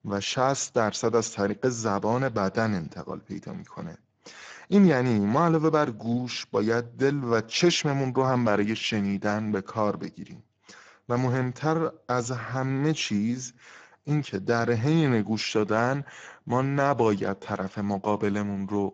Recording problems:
garbled, watery; badly

